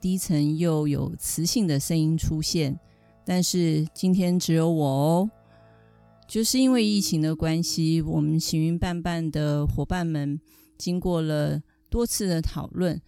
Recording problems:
background music; faint; throughout; 25 dB below the speech

